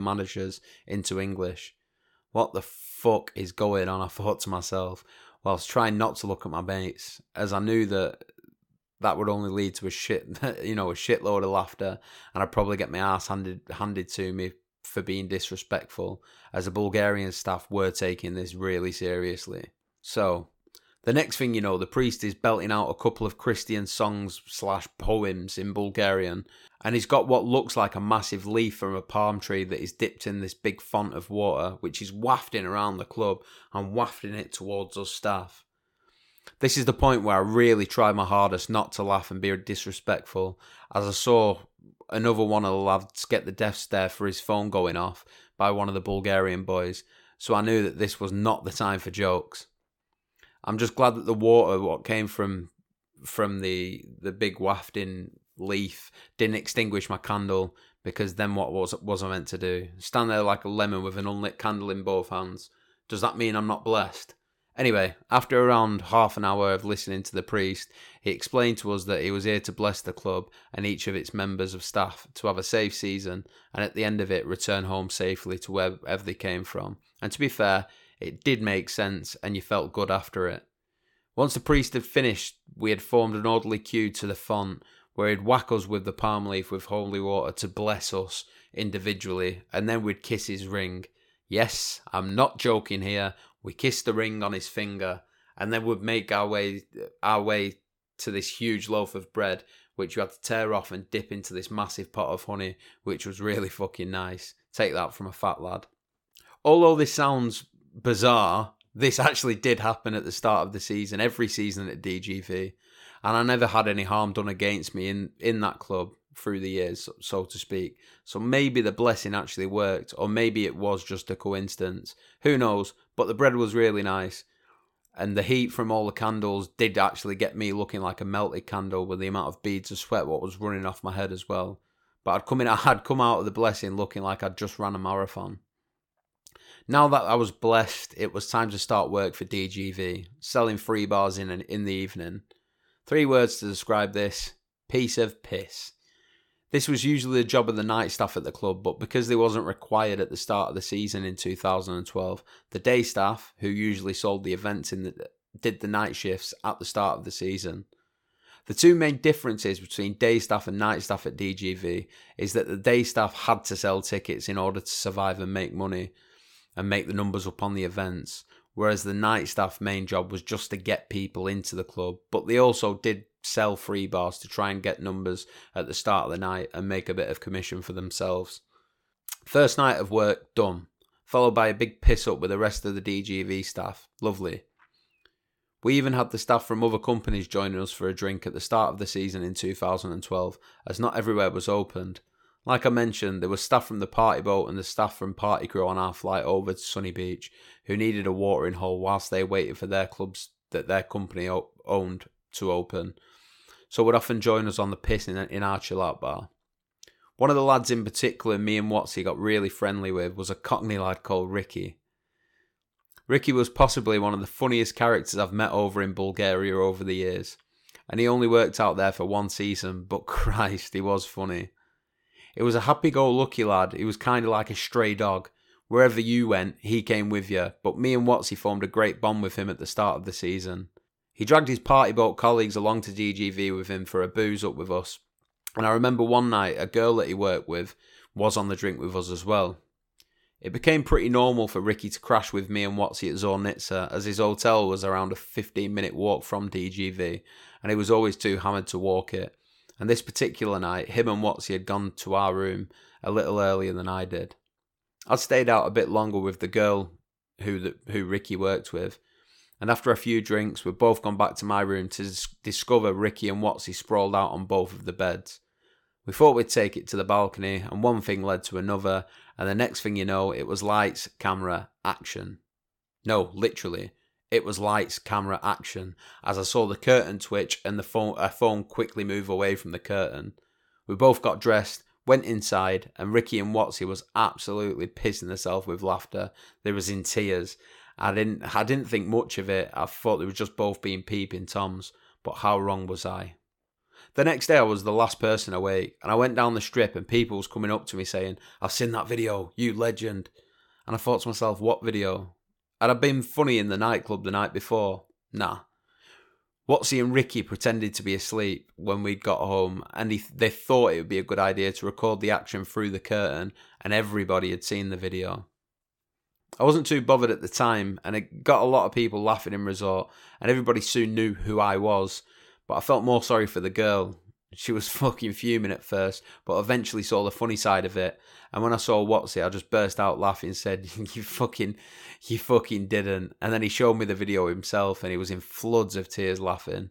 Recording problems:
abrupt cut into speech; at the start

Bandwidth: 17.5 kHz